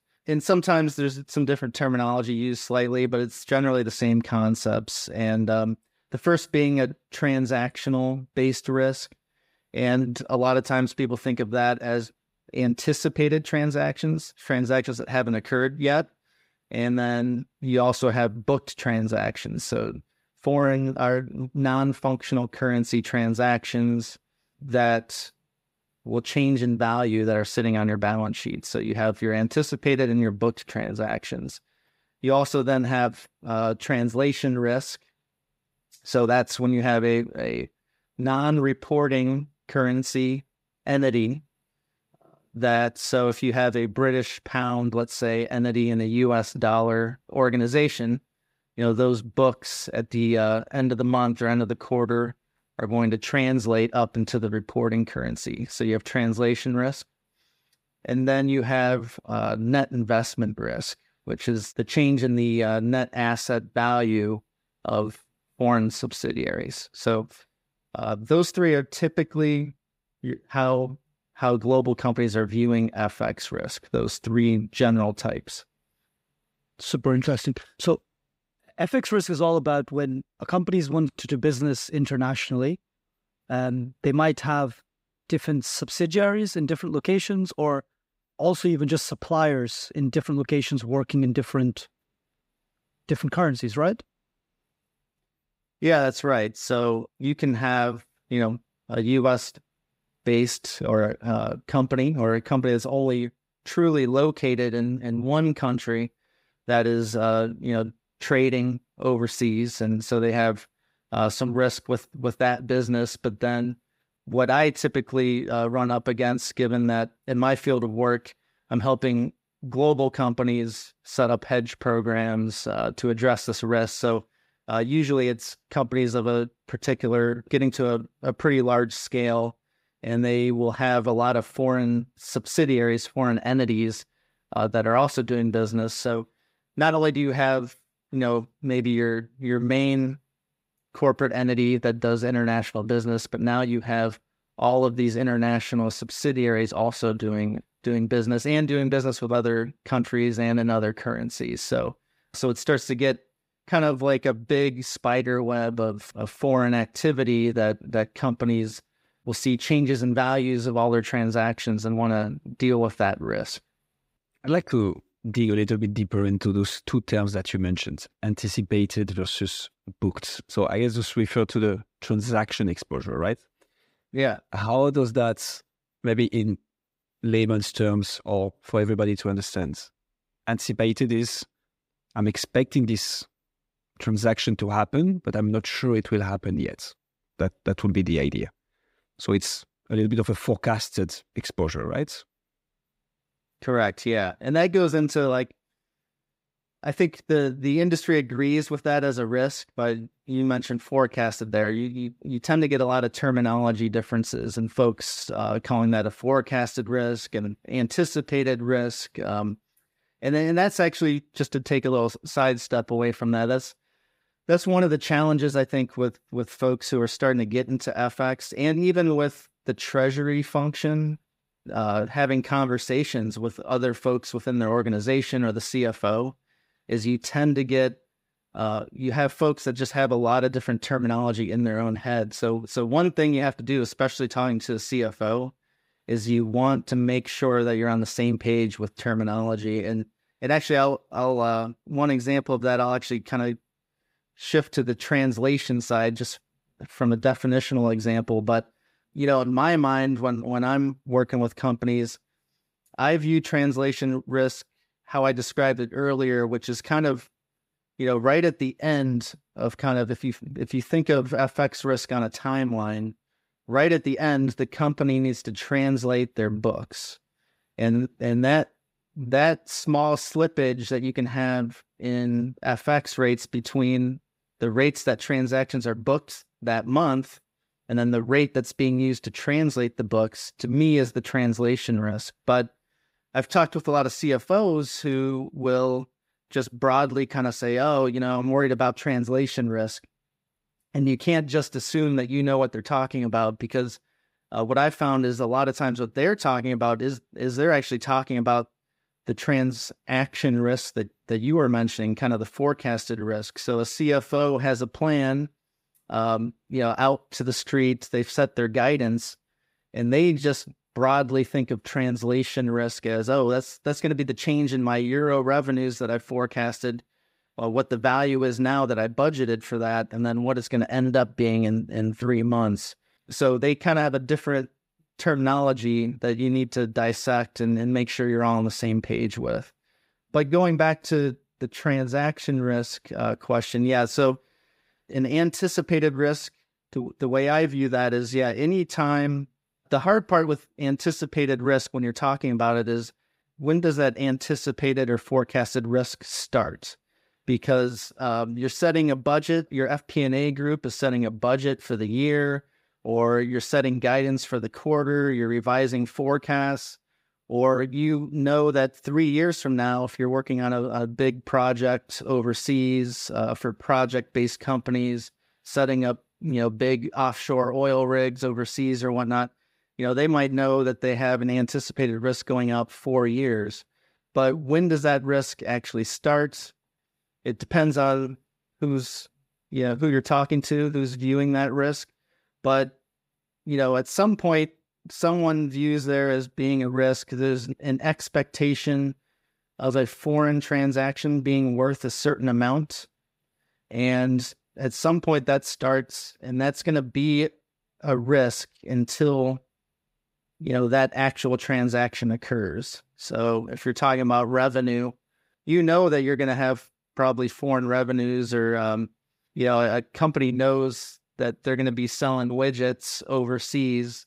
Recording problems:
none

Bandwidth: 15.5 kHz